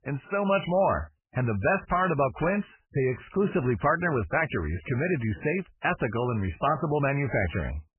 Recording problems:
garbled, watery; badly; nothing above 2.5 kHz

